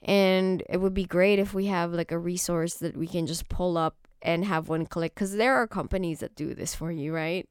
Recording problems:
none

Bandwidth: 17.5 kHz